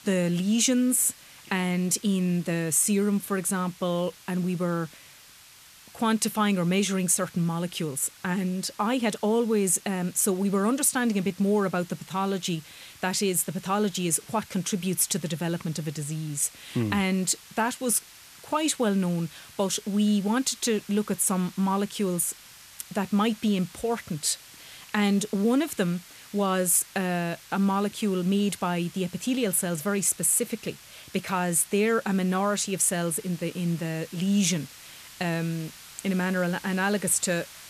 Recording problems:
hiss; faint; throughout; 20 dB below the speech

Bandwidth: 14.5 kHz